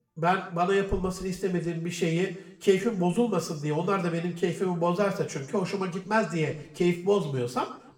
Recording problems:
room echo; slight; dies away in 0.6 s
off-mic speech; somewhat distant

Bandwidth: 18.5 kHz